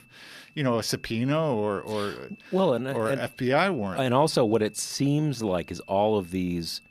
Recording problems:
high-pitched whine; faint; throughout; 2.5 kHz, 25 dB below the speech
uneven, jittery; strongly; from 1 to 5.5 s

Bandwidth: 14.5 kHz